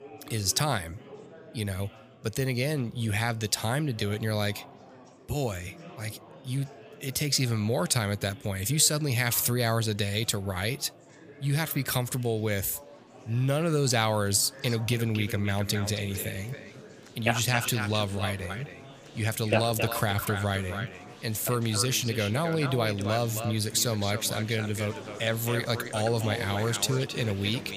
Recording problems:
echo of what is said; strong; from 15 s on; 270 ms later, 10 dB below the speech
murmuring crowd; noticeable; throughout; 20 dB below the speech

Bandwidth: 15 kHz